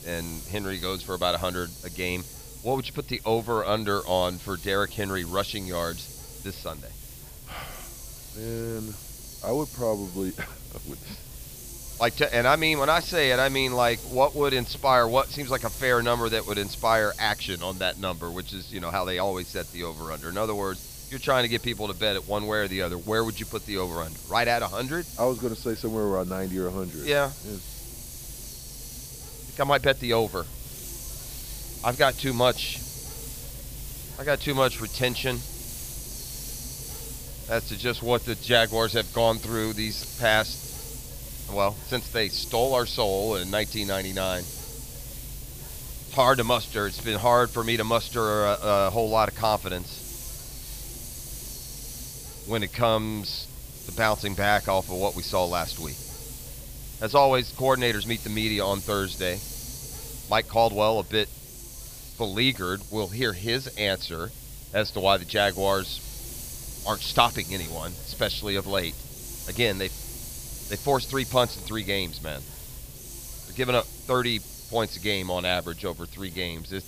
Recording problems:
high frequencies cut off; noticeable; nothing above 5.5 kHz
hiss; noticeable; throughout; 10 dB below the speech

